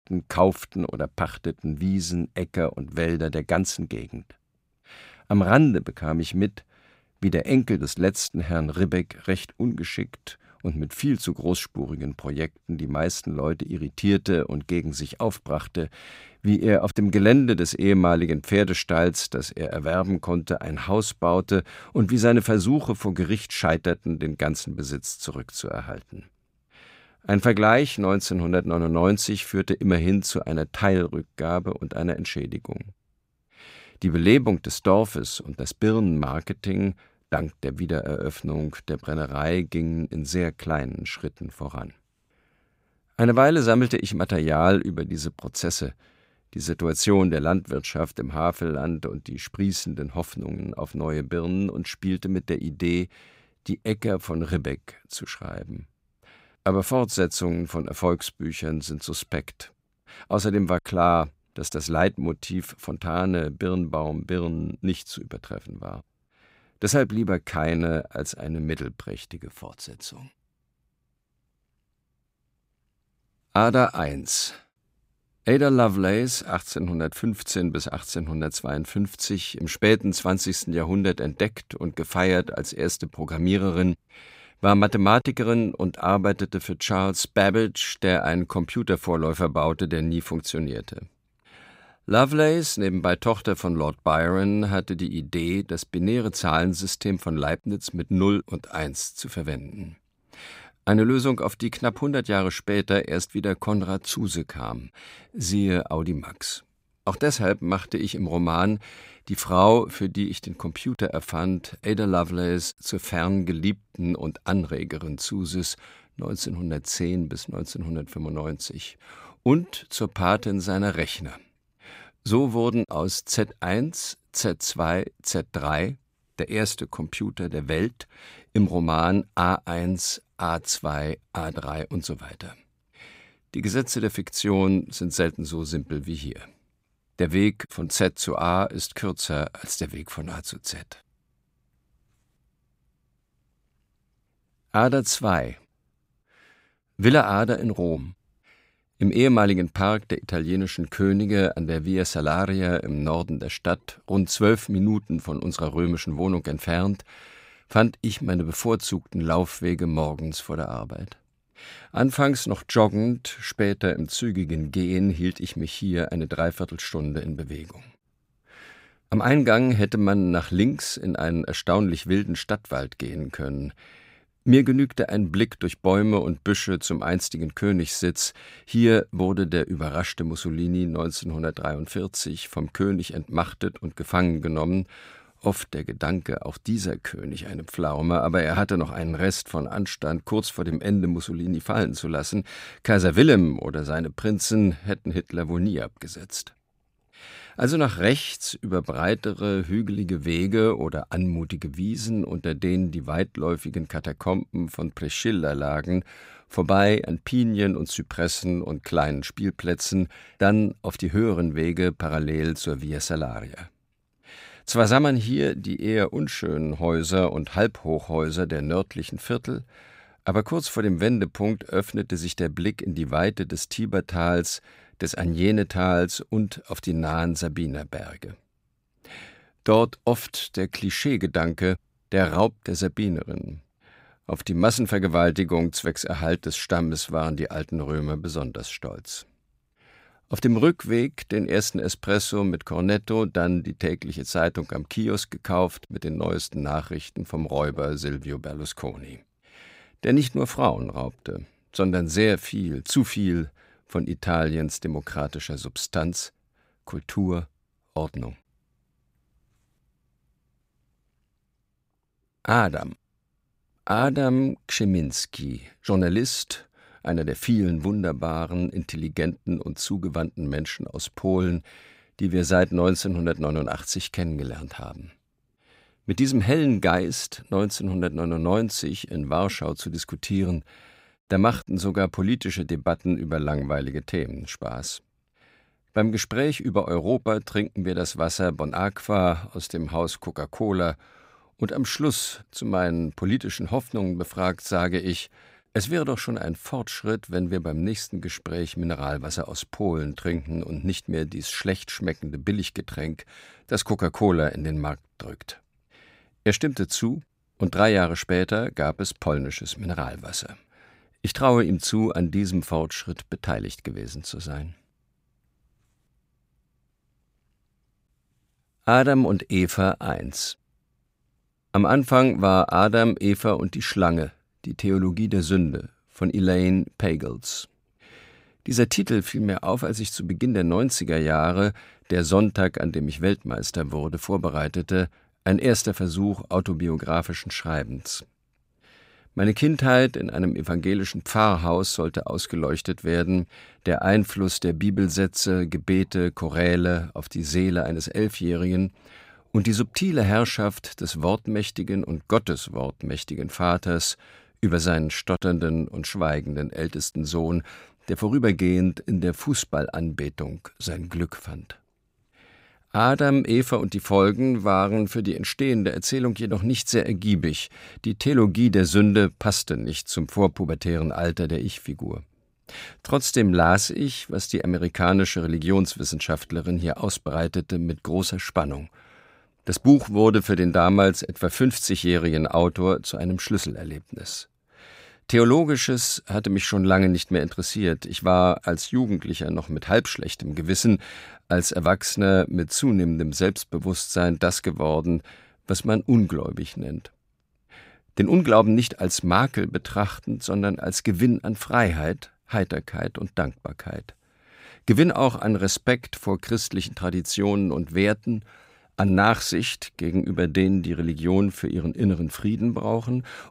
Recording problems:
none

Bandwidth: 15.5 kHz